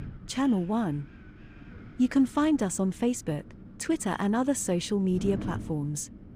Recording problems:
wind noise on the microphone; occasional gusts; 20 dB below the speech

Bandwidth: 15 kHz